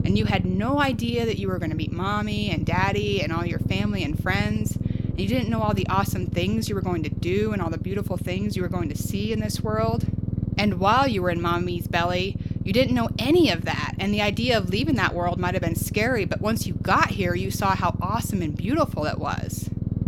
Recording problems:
low rumble; noticeable; throughout; 15 dB below the speech

